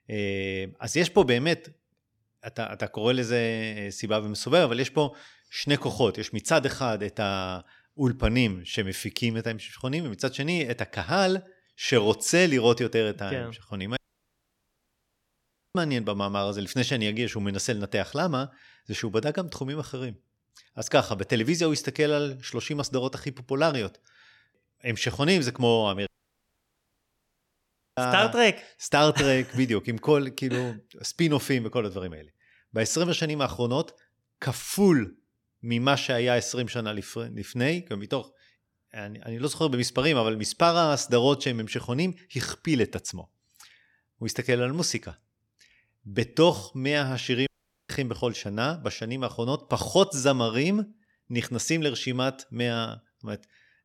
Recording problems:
audio cutting out; at 14 s for 2 s, at 26 s for 2 s and at 47 s

